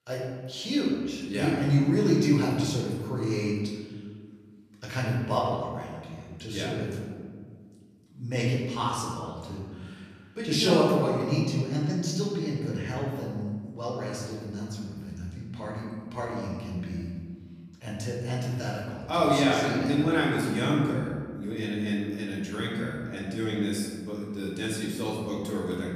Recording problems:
off-mic speech; far
room echo; noticeable; dies away in 1.6 s

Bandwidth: 14.5 kHz